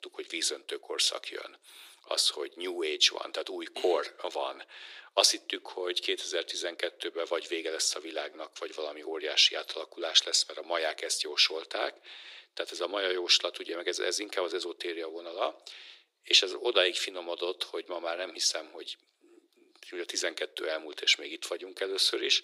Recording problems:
thin; very; fading below 350 Hz

